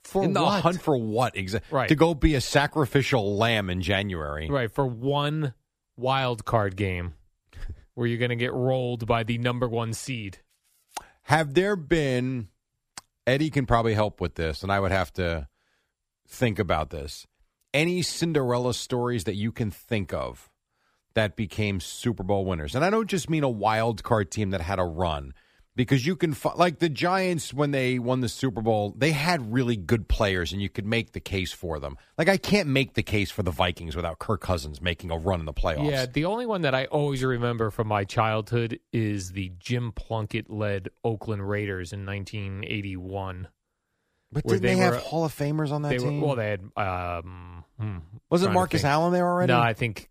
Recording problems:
none

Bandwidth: 15 kHz